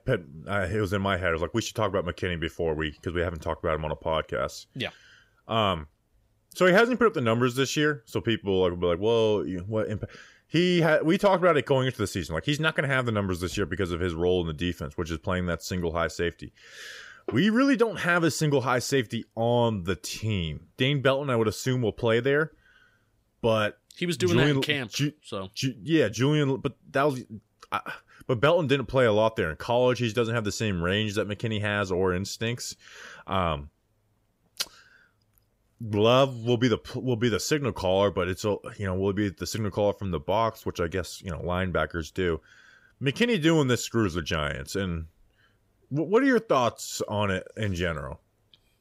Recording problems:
none

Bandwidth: 15.5 kHz